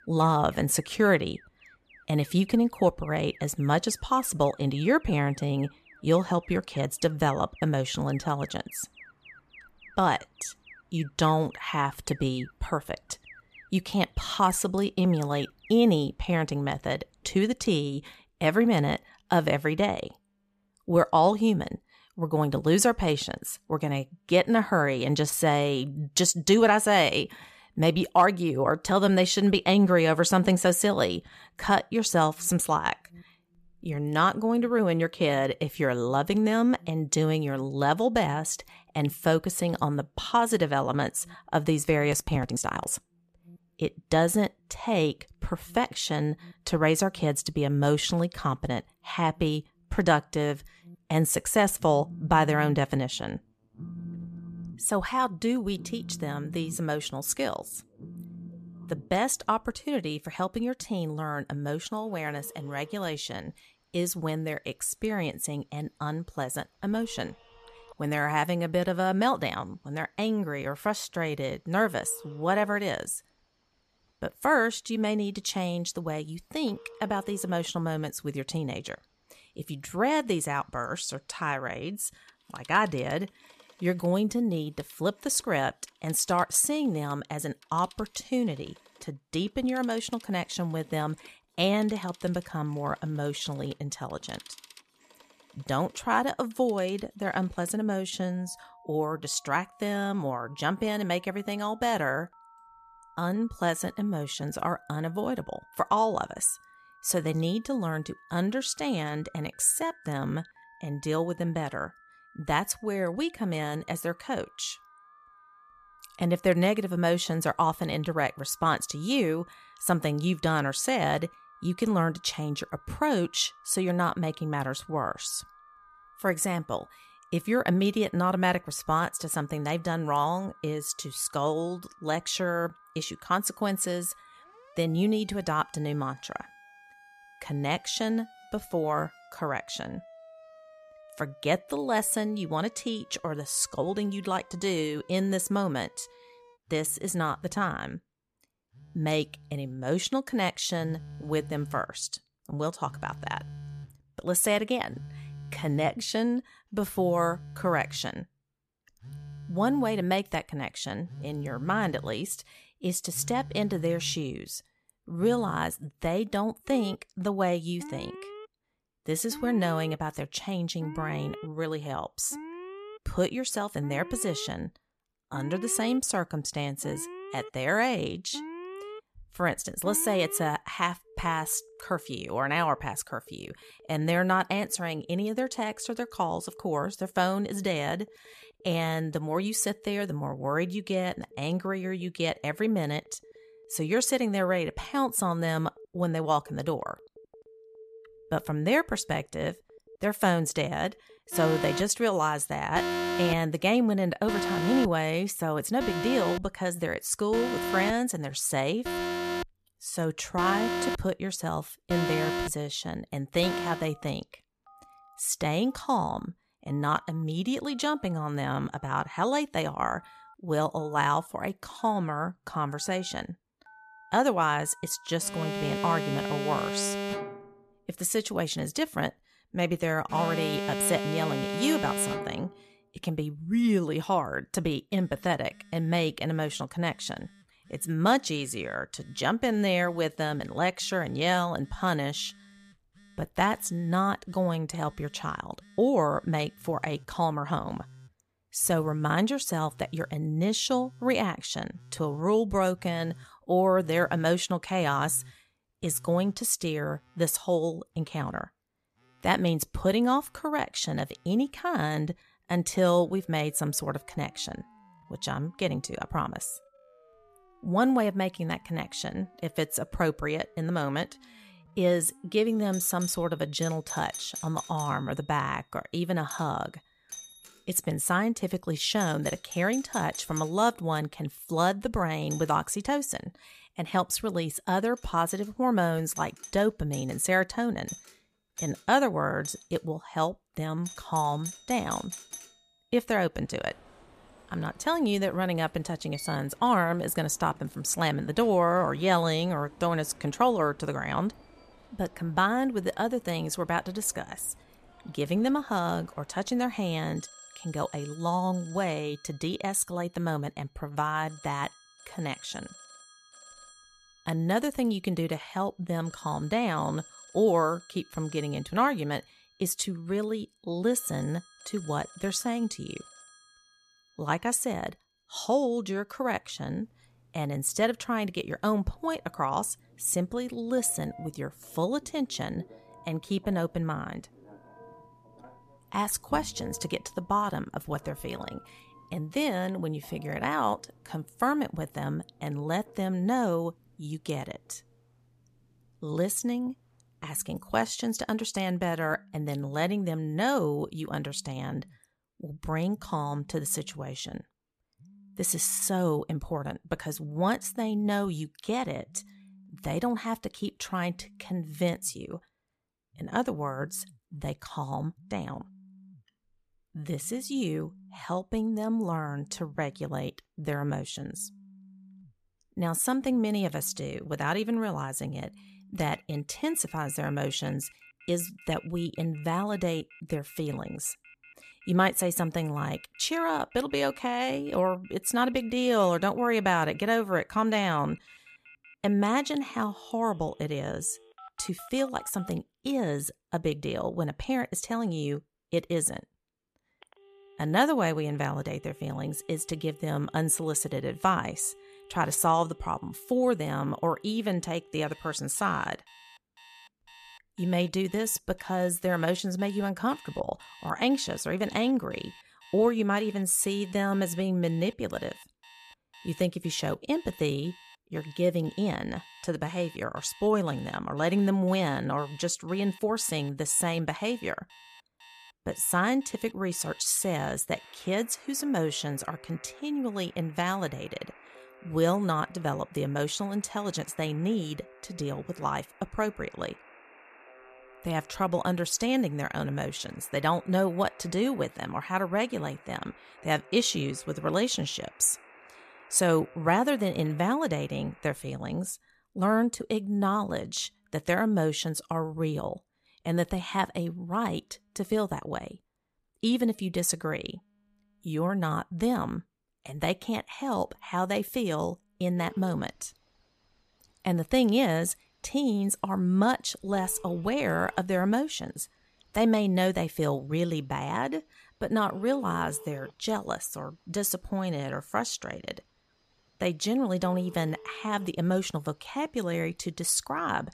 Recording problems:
alarms or sirens; noticeable; throughout; 15 dB below the speech

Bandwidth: 14.5 kHz